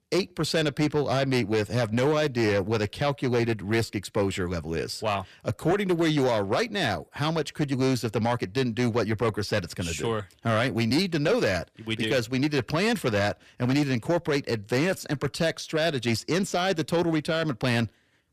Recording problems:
distortion; slight; 10 dB below the speech

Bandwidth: 14.5 kHz